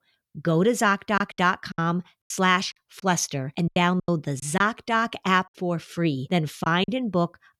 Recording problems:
choppy; very; 8% of the speech affected

